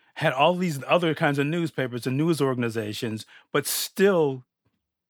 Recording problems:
none

